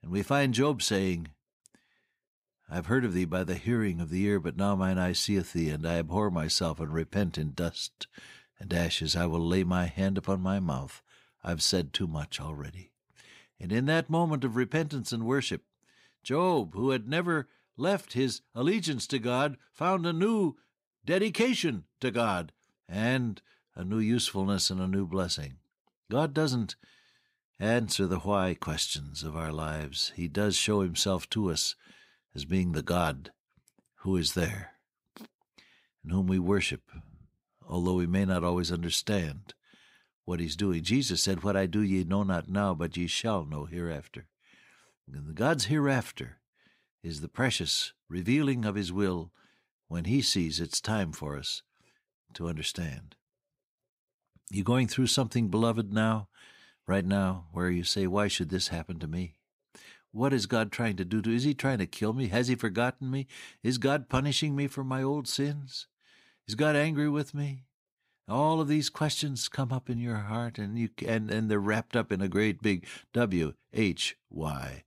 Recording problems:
none

